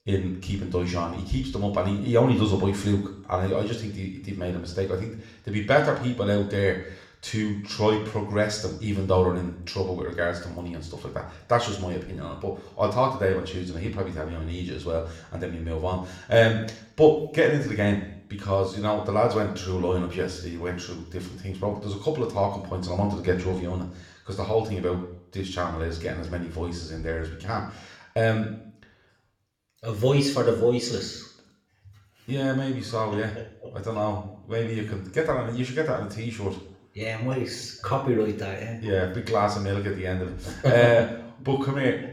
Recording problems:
room echo; slight; dies away in 0.6 s
off-mic speech; somewhat distant

